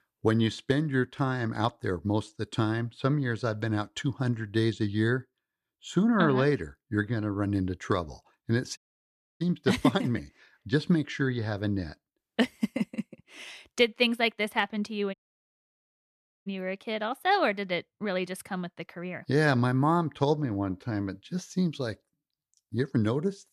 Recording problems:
audio cutting out; at 9 s for 0.5 s and at 15 s for 1.5 s

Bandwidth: 14.5 kHz